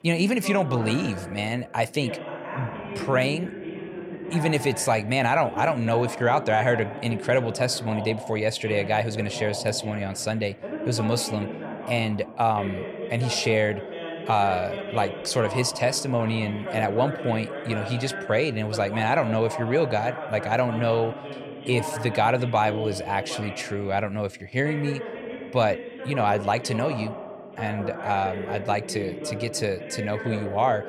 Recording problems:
voice in the background; loud; throughout; 9 dB below the speech

